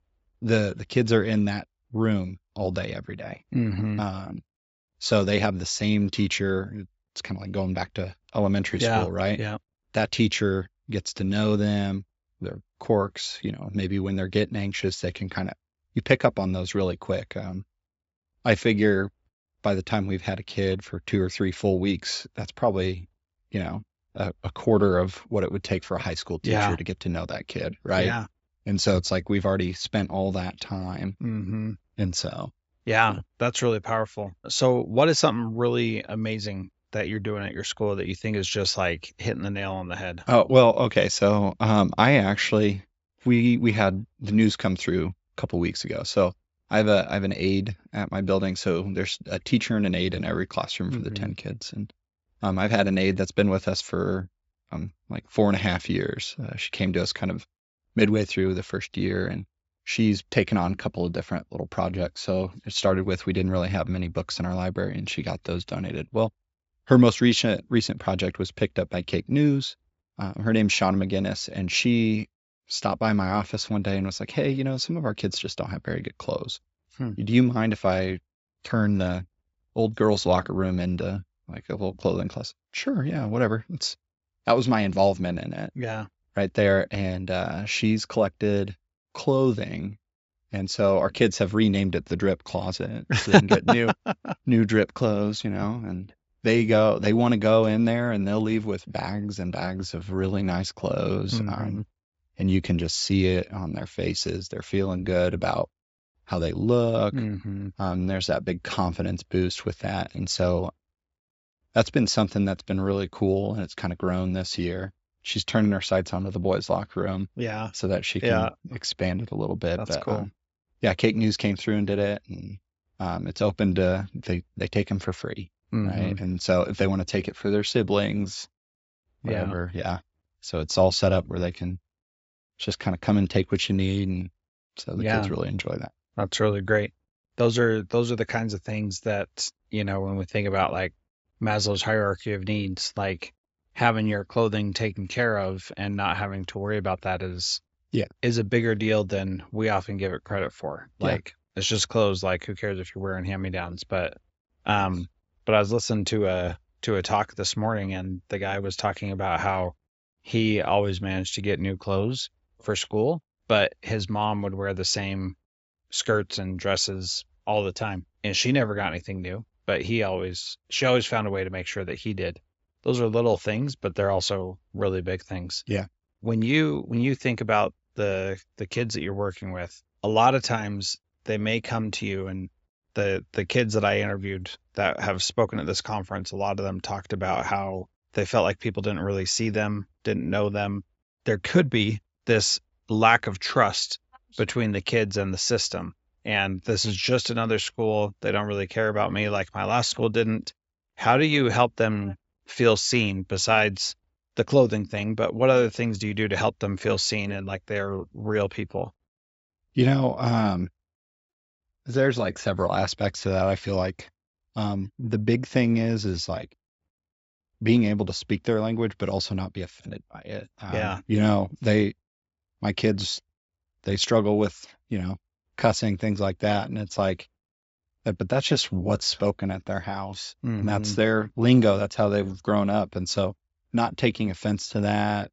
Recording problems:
high frequencies cut off; noticeable; nothing above 8 kHz

